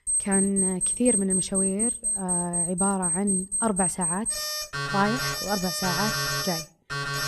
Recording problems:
alarms or sirens; very loud; throughout; 3 dB above the speech

